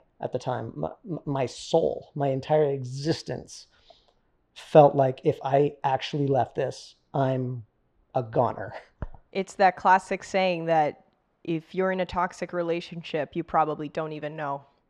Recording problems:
muffled; slightly; fading above 3.5 kHz

